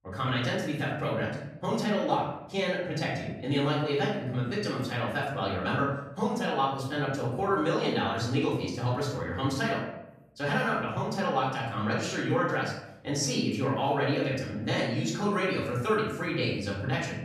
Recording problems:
off-mic speech; far
room echo; noticeable; dies away in 0.8 s

